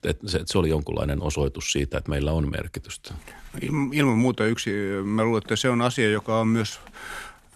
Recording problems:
none

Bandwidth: 13.5 kHz